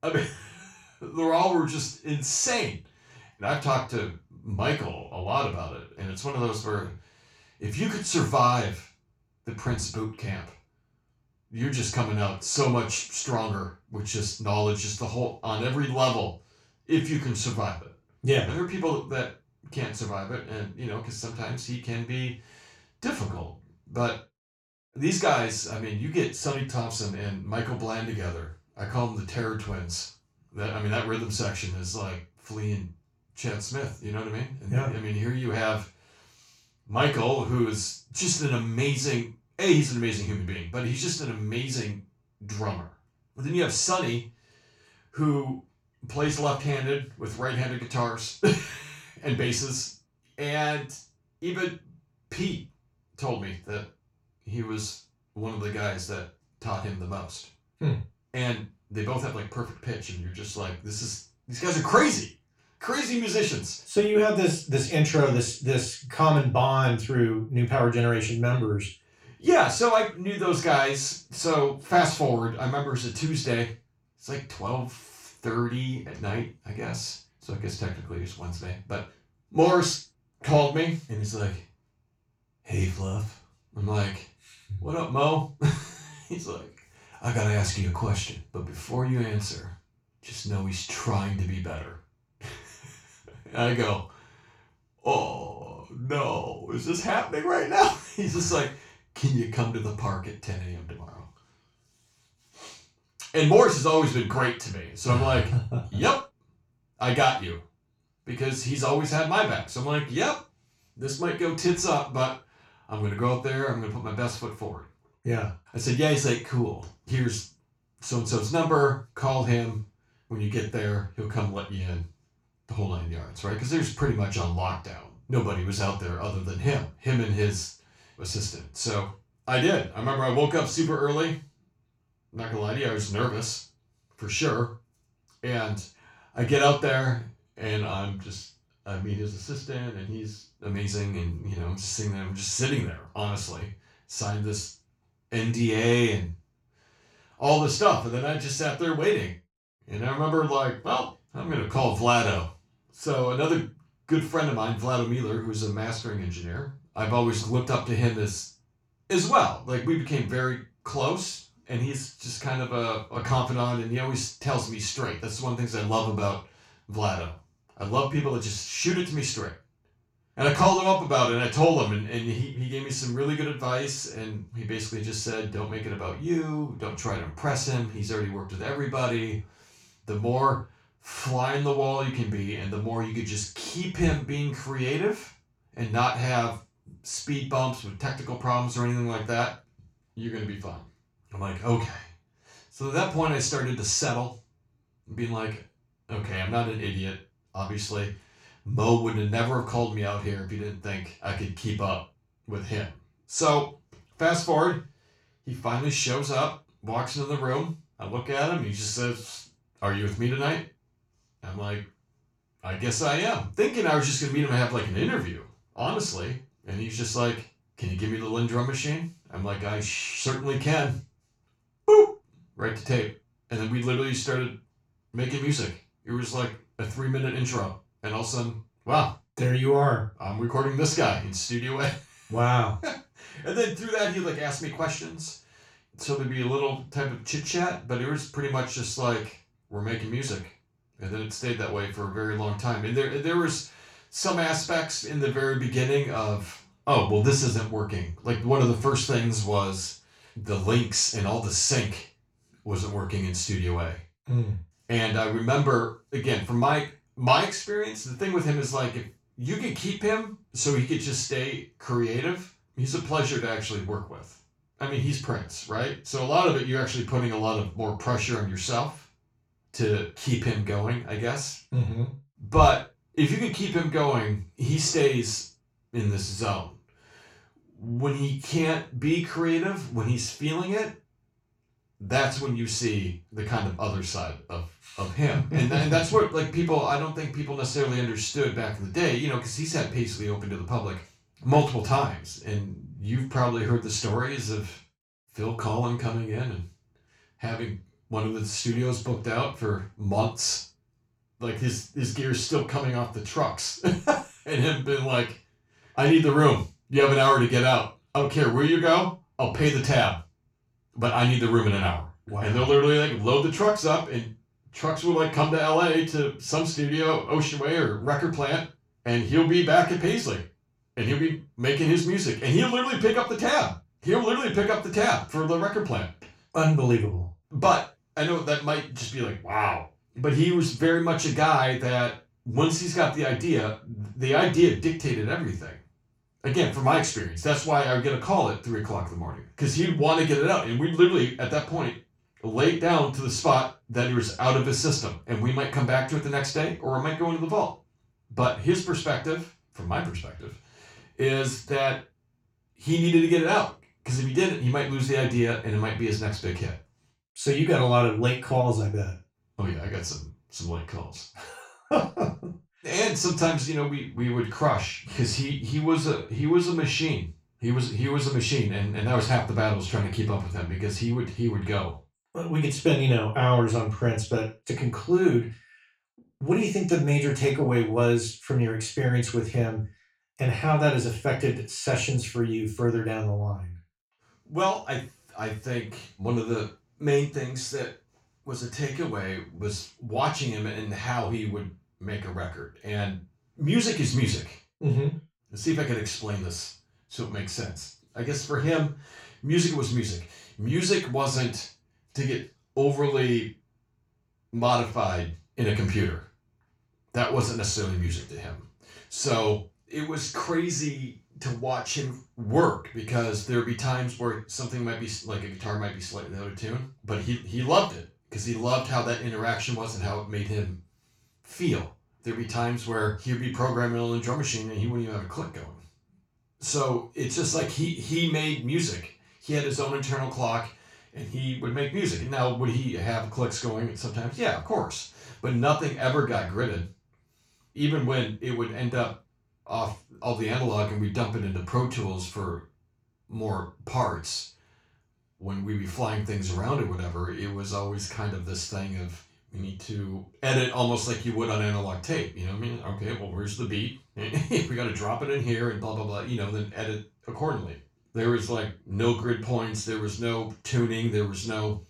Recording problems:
off-mic speech; far
room echo; noticeable; dies away in 0.3 s

